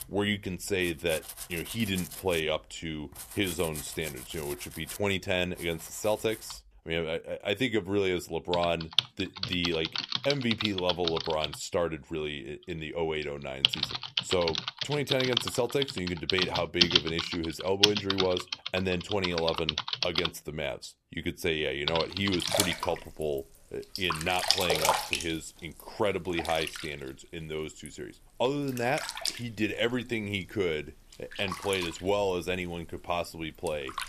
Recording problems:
household noises; very loud; throughout; as loud as the speech

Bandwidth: 14.5 kHz